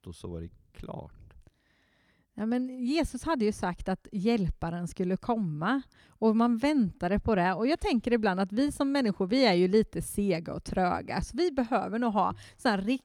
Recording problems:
none

